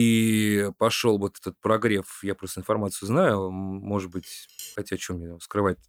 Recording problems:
abrupt cut into speech; at the start
clattering dishes; faint; at 4 s; peak 15 dB below the speech

